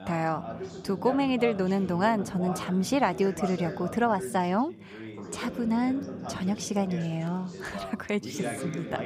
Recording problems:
background chatter; loud; throughout; 2 voices, 10 dB below the speech

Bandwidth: 15.5 kHz